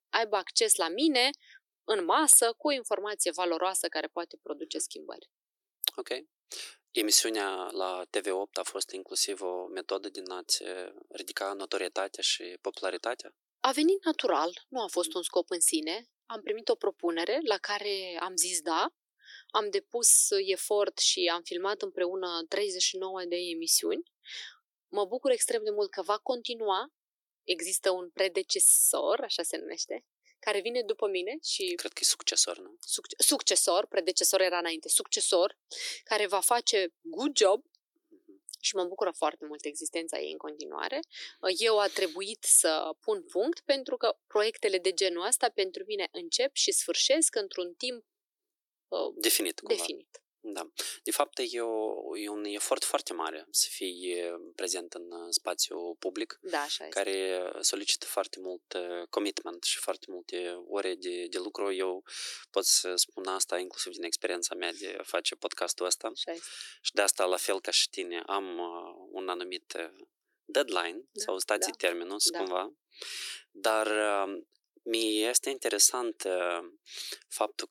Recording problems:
thin; very; fading below 300 Hz

